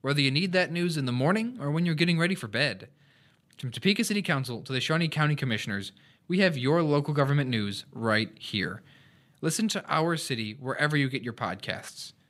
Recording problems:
none

